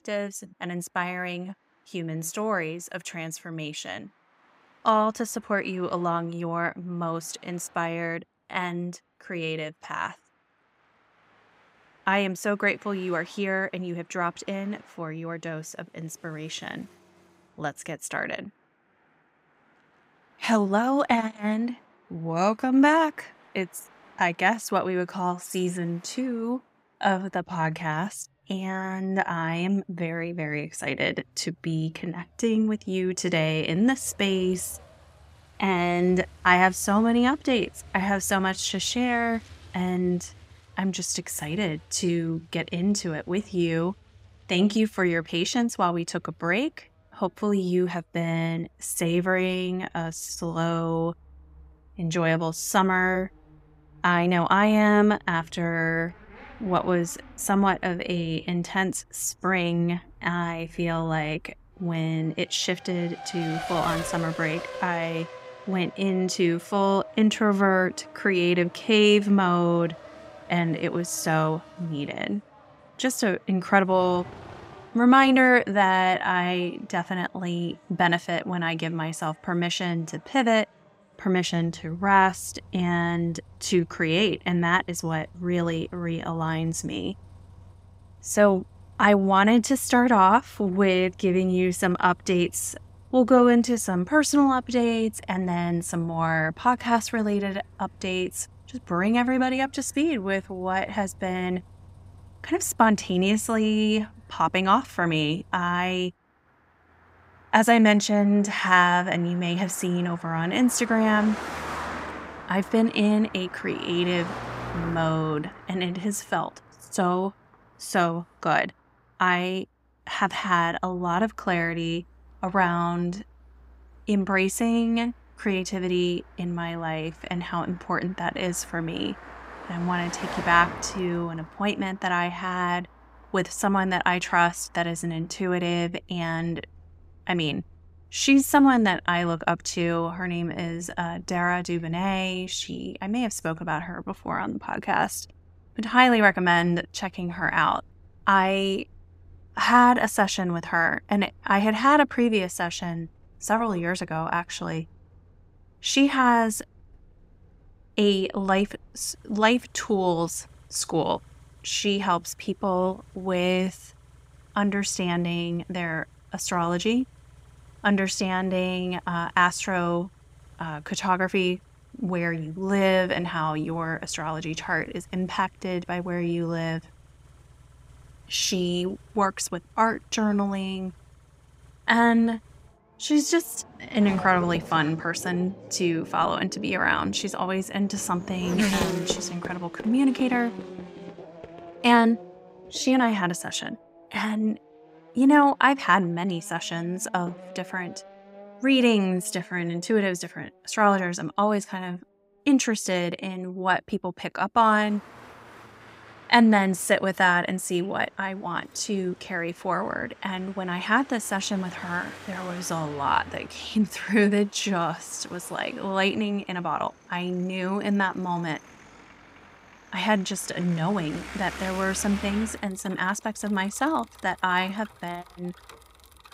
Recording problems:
traffic noise; noticeable; throughout; 20 dB below the speech

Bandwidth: 15.5 kHz